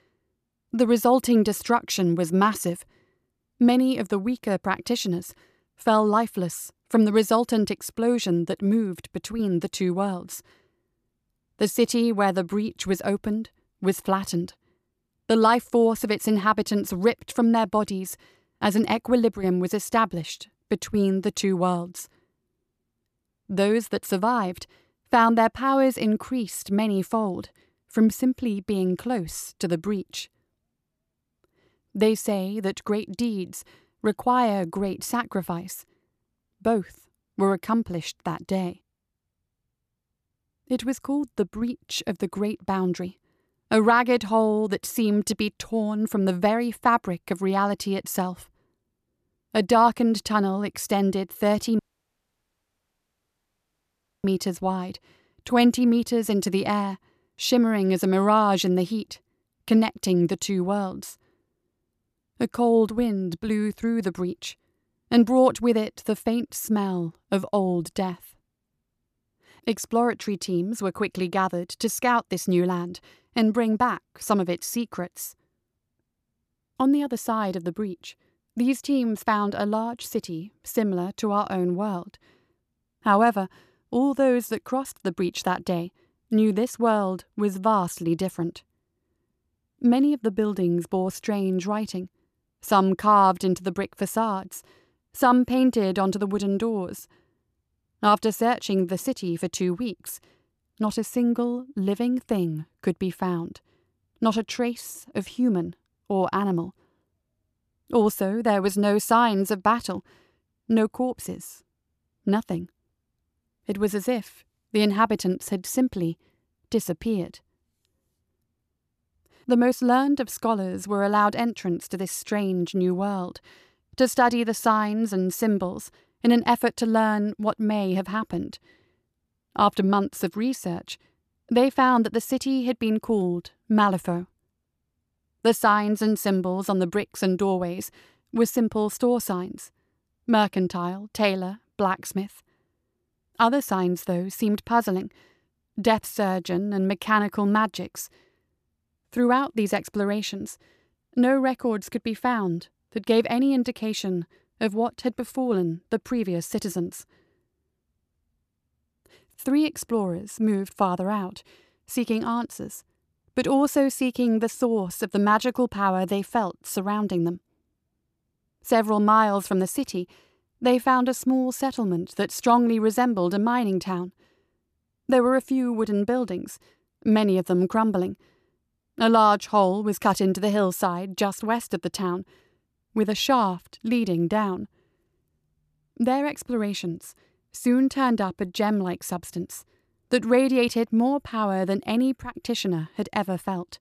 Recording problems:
audio cutting out; at 52 s for 2.5 s

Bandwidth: 14.5 kHz